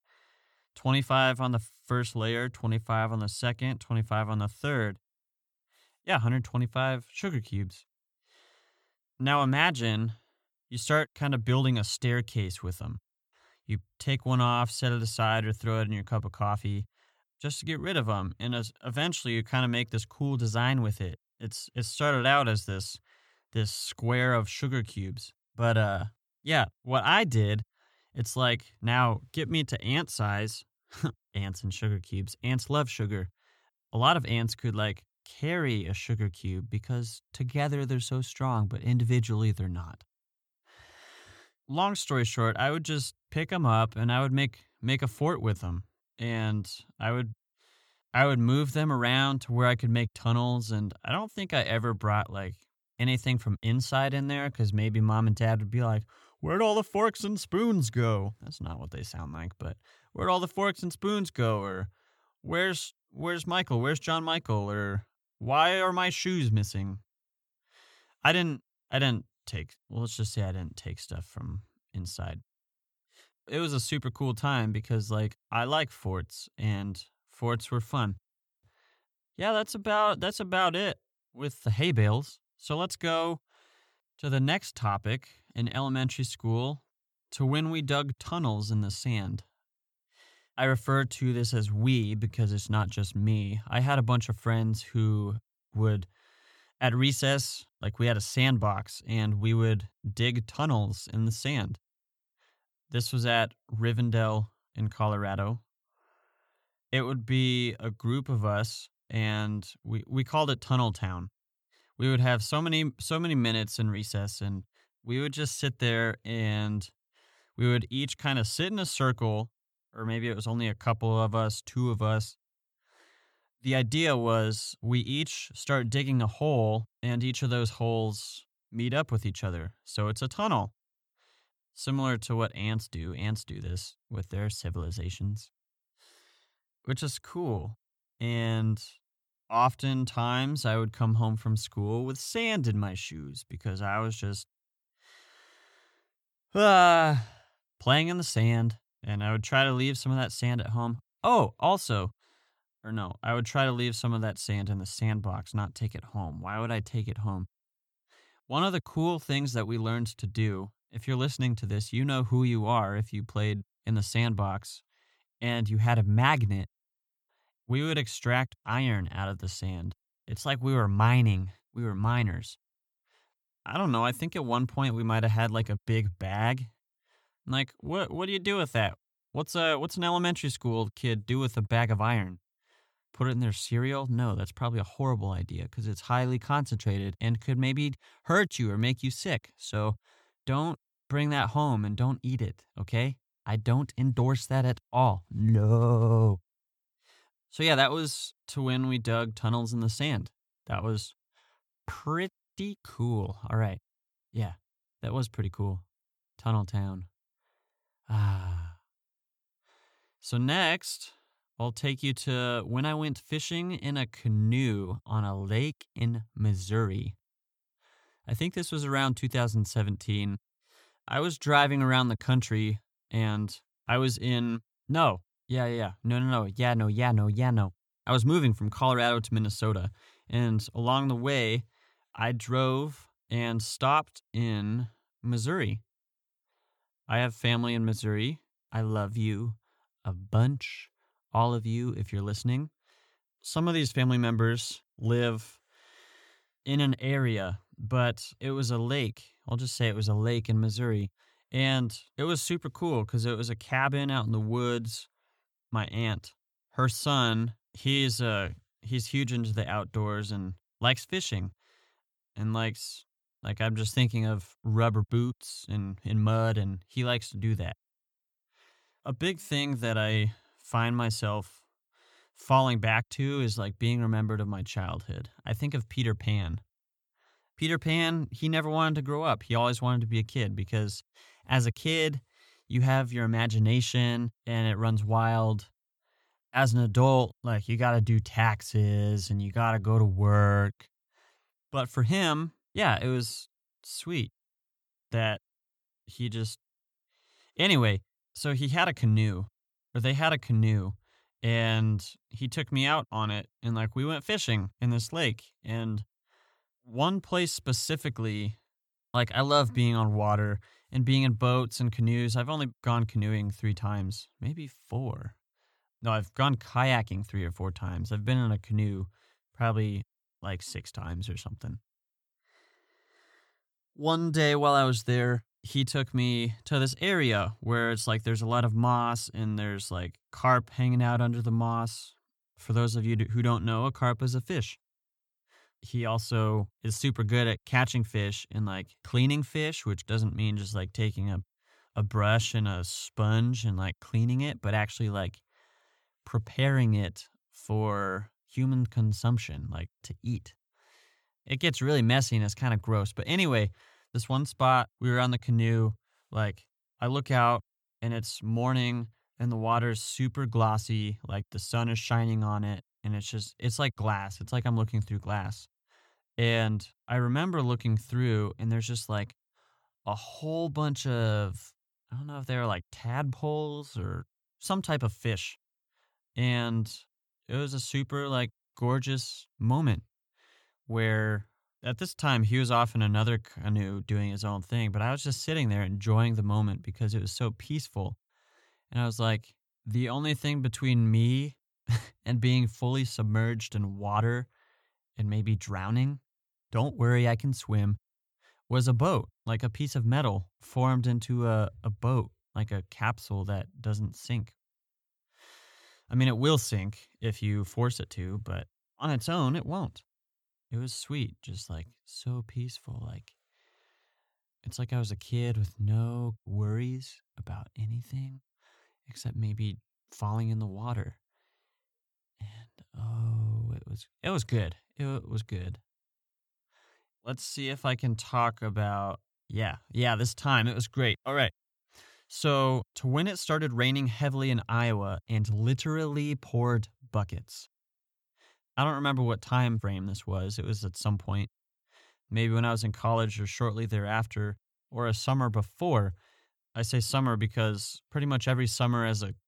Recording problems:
none

